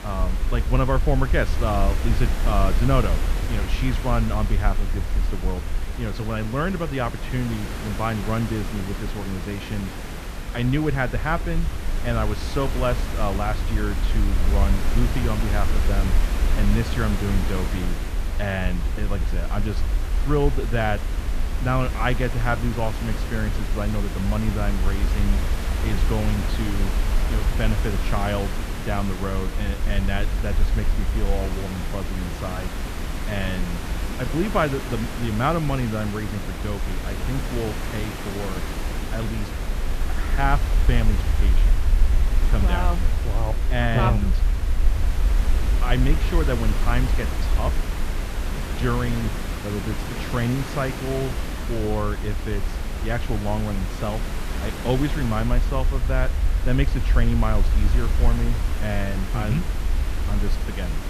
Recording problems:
muffled; slightly; fading above 3.5 kHz
hiss; loud; throughout; 6 dB below the speech
low rumble; faint; throughout; 20 dB below the speech

